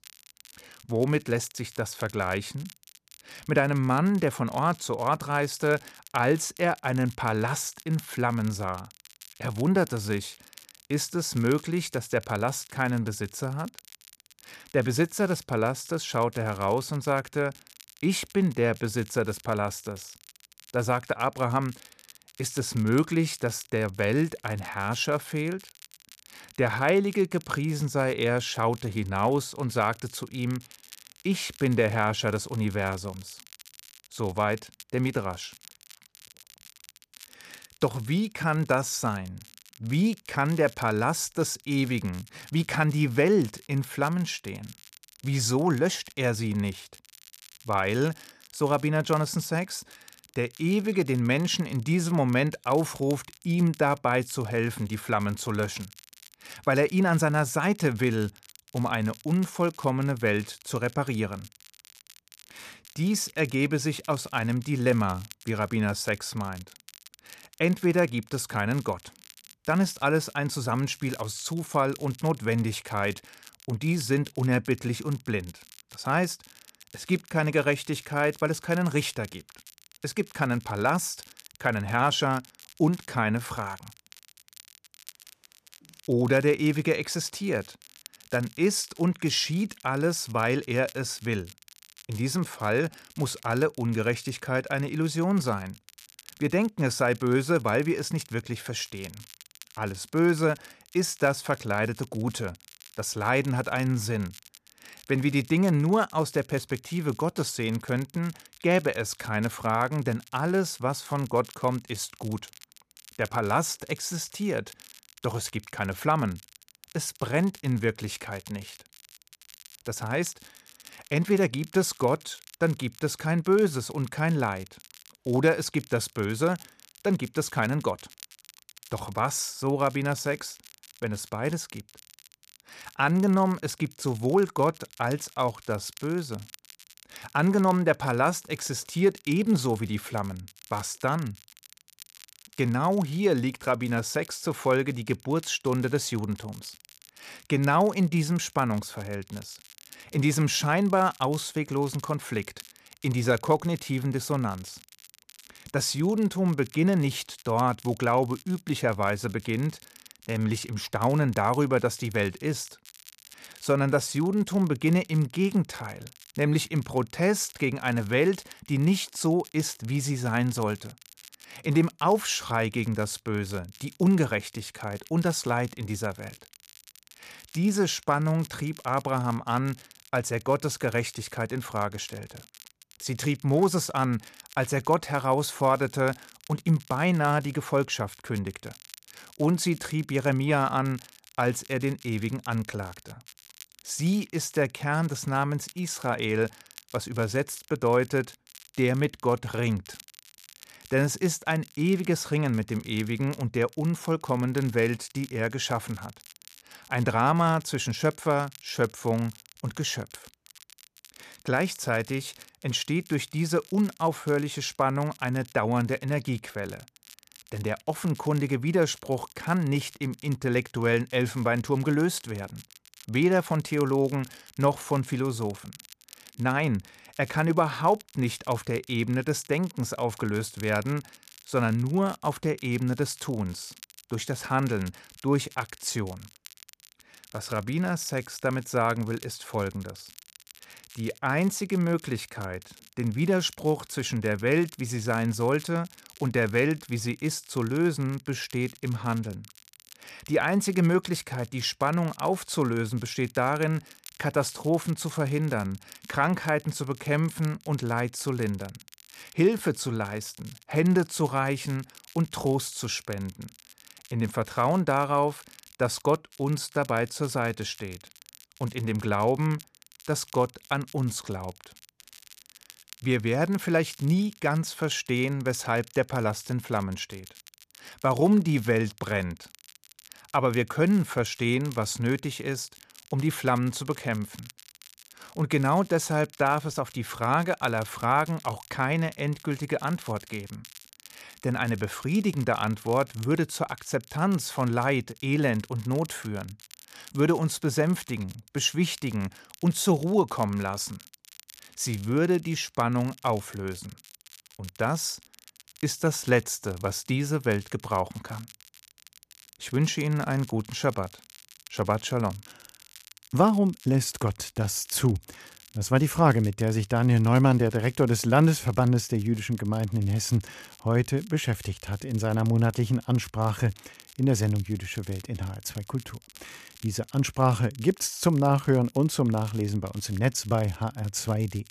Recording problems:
crackle, like an old record; faint; 20 dB below the speech

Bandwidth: 14.5 kHz